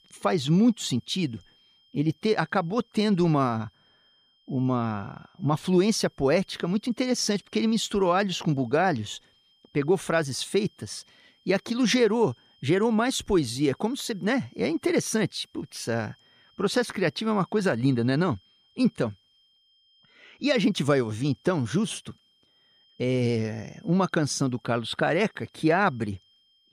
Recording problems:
high-pitched whine; faint; throughout; 3 kHz, 35 dB below the speech

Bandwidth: 15 kHz